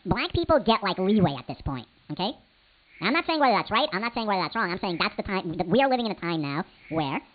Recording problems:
high frequencies cut off; severe; nothing above 4.5 kHz
wrong speed and pitch; too fast and too high; 1.6 times normal speed
hiss; faint; throughout; 25 dB below the speech

